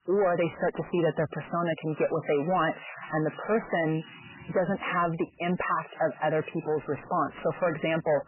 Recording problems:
garbled, watery; badly; nothing above 3 kHz
distortion; slight; 10 dB below the speech
household noises; noticeable; throughout; 20 dB below the speech

